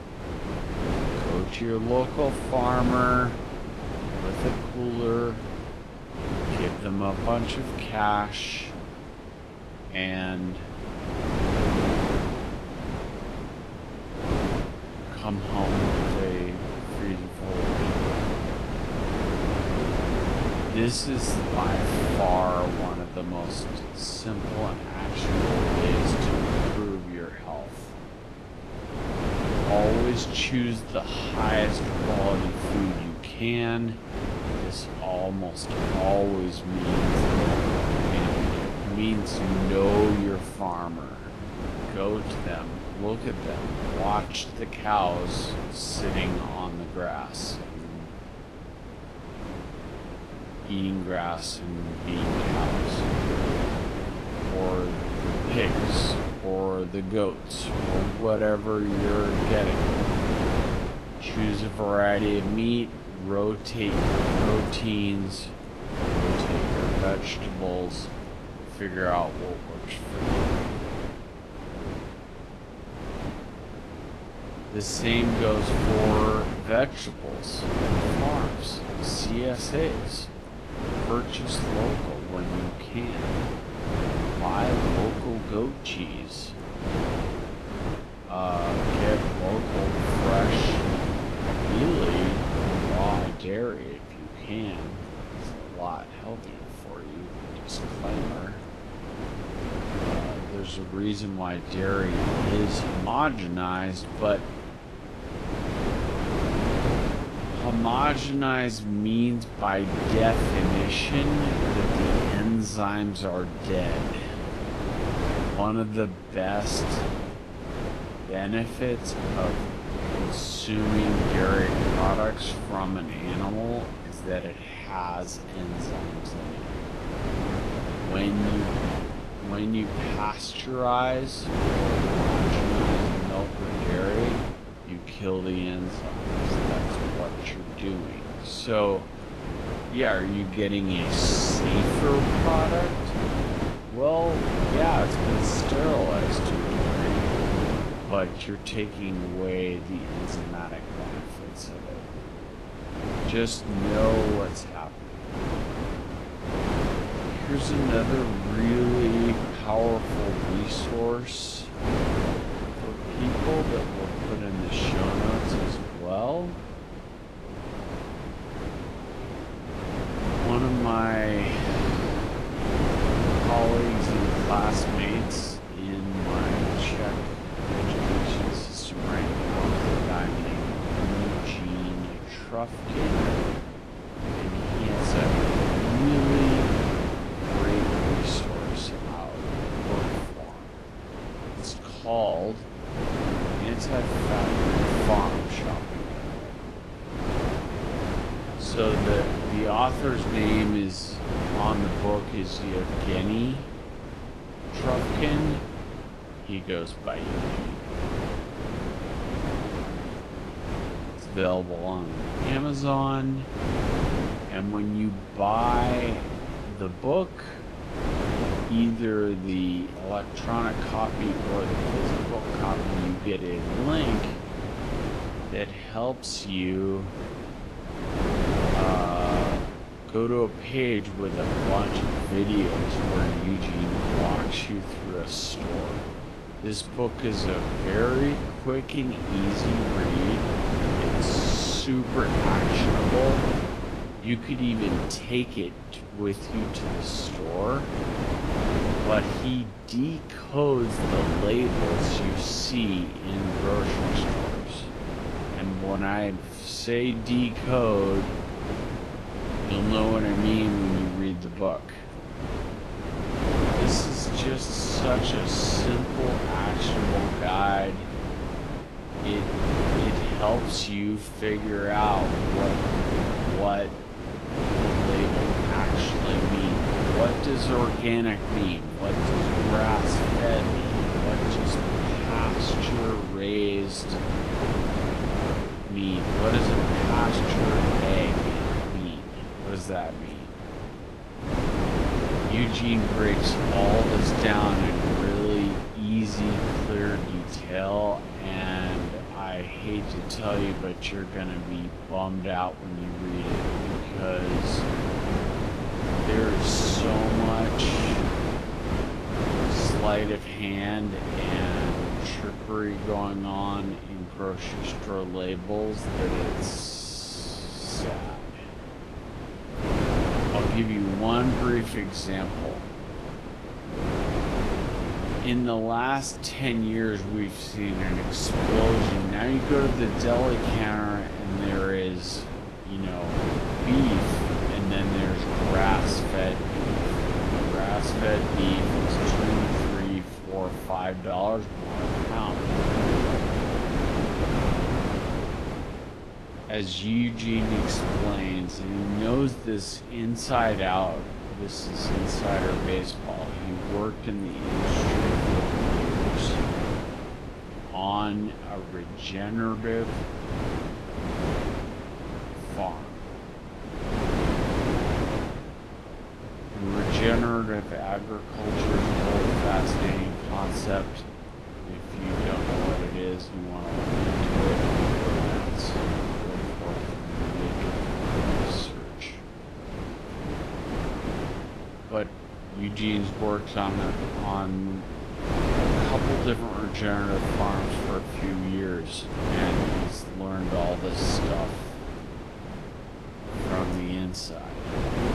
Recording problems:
wrong speed, natural pitch; too slow; 0.5 times normal speed
garbled, watery; slightly; nothing above 11.5 kHz
wind noise on the microphone; heavy; 1 dB below the speech

